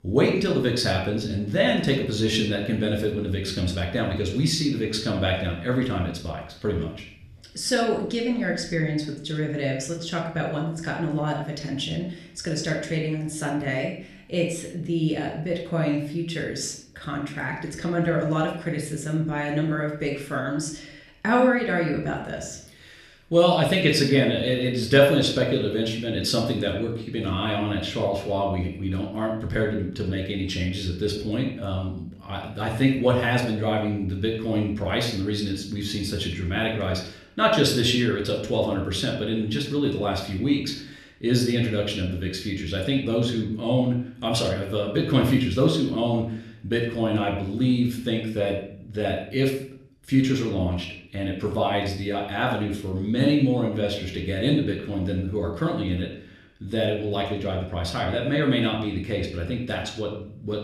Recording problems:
room echo; slight; dies away in 0.5 s
off-mic speech; somewhat distant

